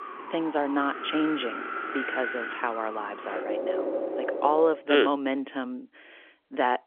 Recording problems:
phone-call audio; nothing above 3.5 kHz
wind in the background; loud; until 4.5 s; 5 dB below the speech

